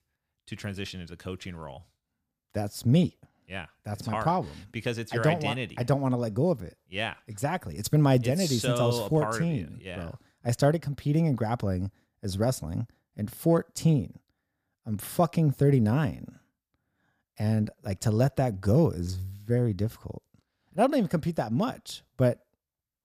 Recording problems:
none

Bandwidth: 15 kHz